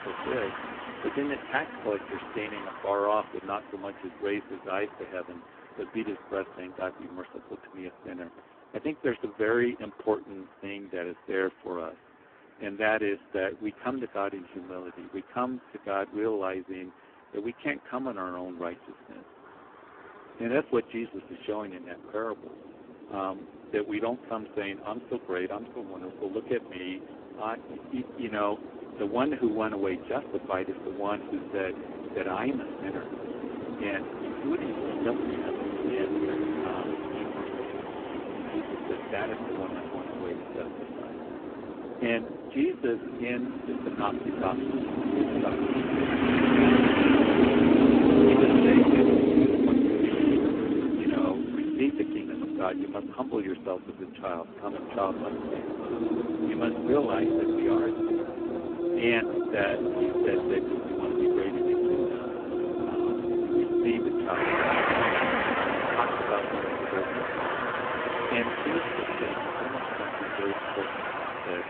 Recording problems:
phone-call audio; poor line
traffic noise; very loud; throughout; 5 dB above the speech

